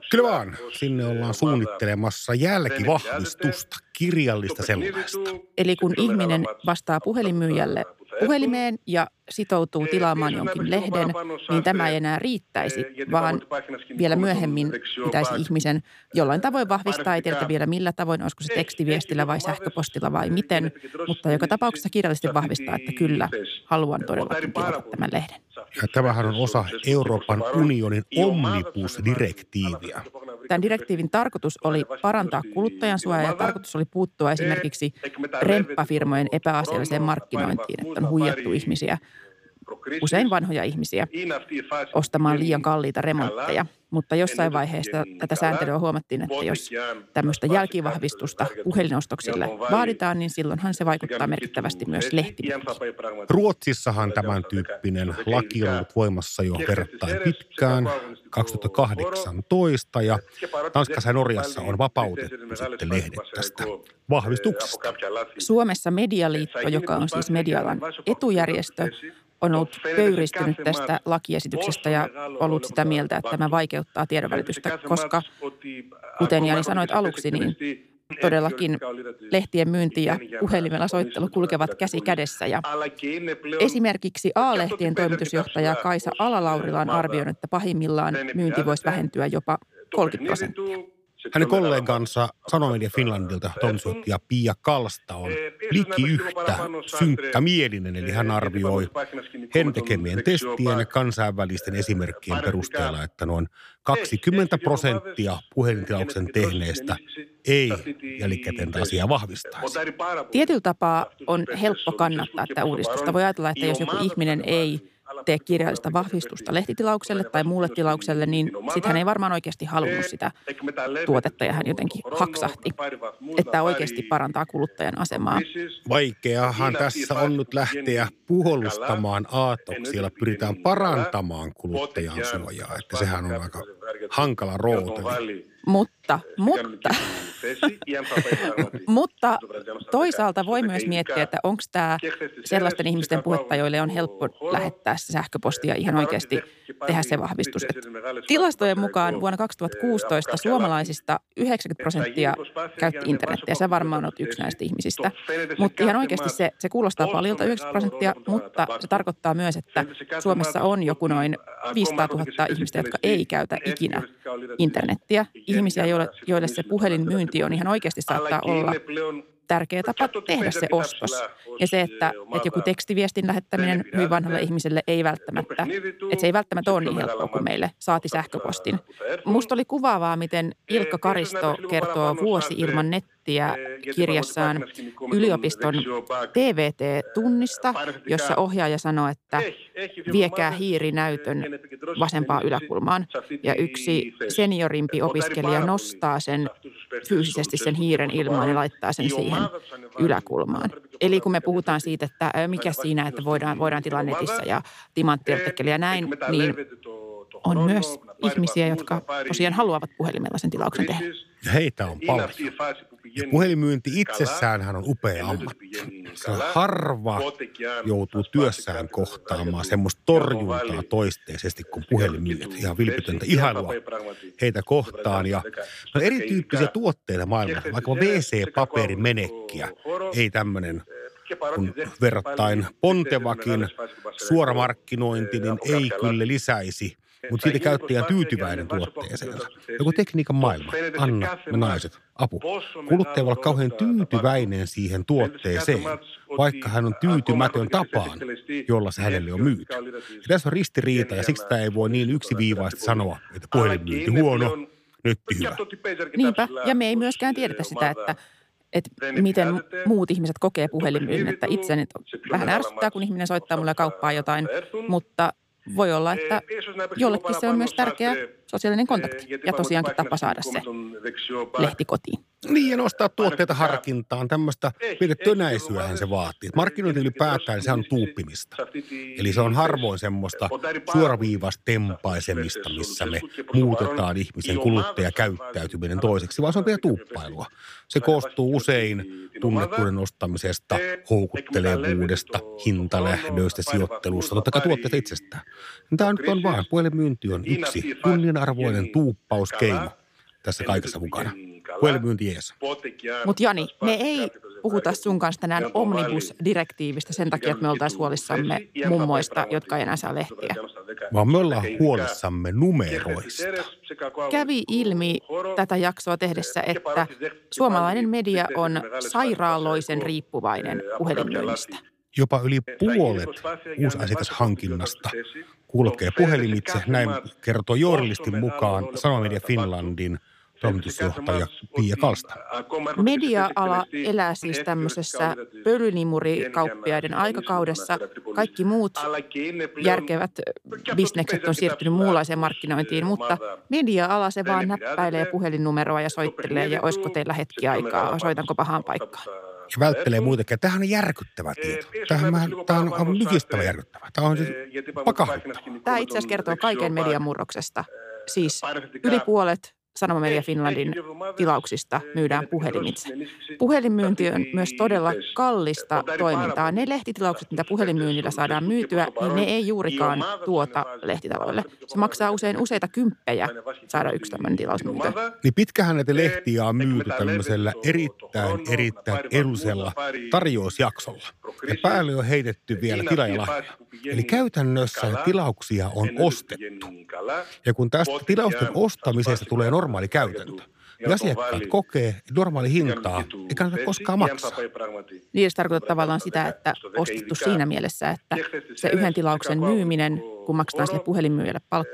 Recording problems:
voice in the background; loud; throughout; 8 dB below the speech

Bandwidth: 15 kHz